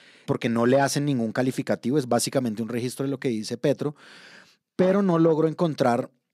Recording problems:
none

